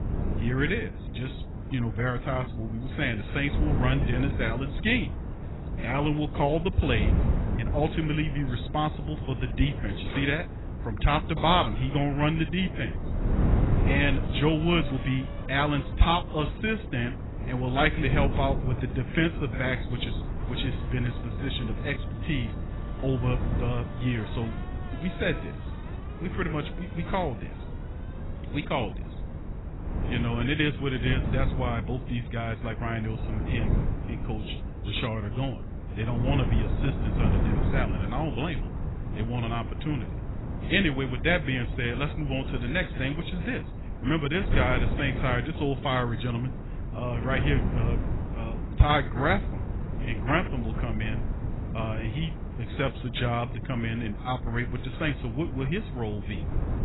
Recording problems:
garbled, watery; badly; nothing above 4 kHz
wind noise on the microphone; occasional gusts; 10 dB below the speech
traffic noise; faint; throughout; 20 dB below the speech

